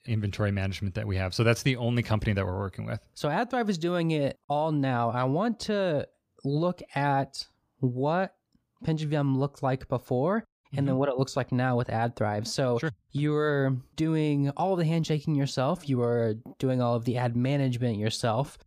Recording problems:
none

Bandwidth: 15 kHz